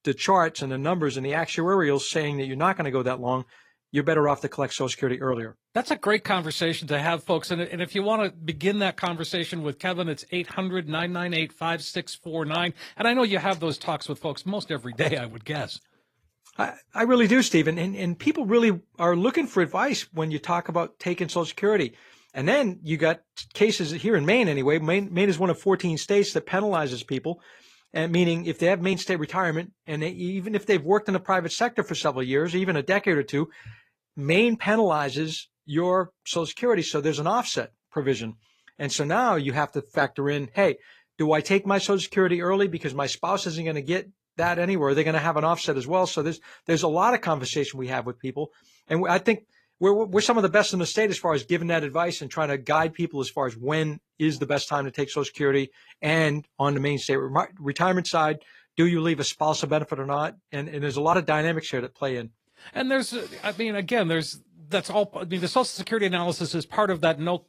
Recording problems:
garbled, watery; slightly

